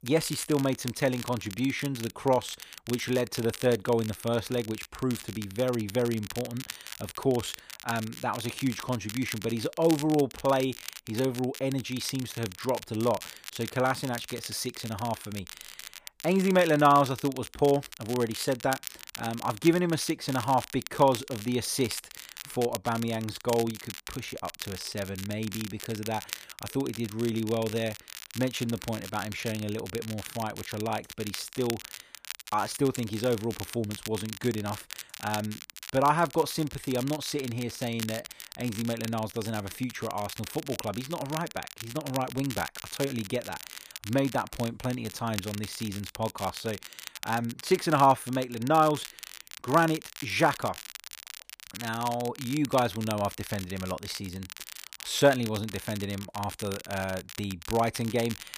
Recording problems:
crackle, like an old record; noticeable; 10 dB below the speech

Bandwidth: 15 kHz